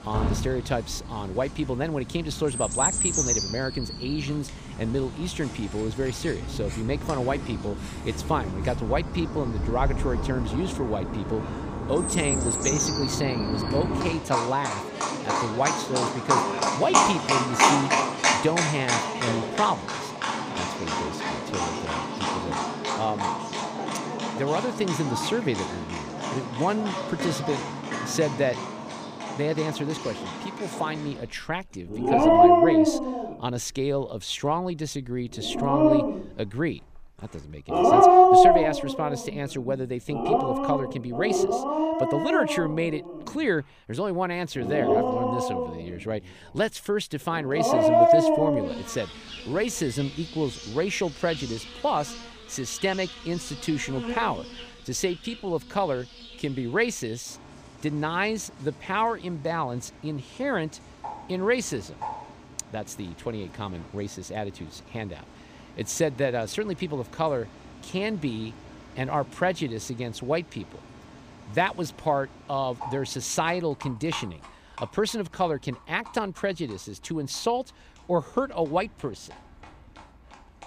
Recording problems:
animal sounds; very loud; throughout; 4 dB above the speech

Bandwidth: 15 kHz